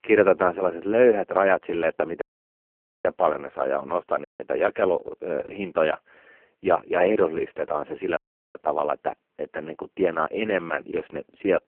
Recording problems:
phone-call audio; poor line
audio cutting out; at 2 s for 1 s, at 4.5 s and at 8 s

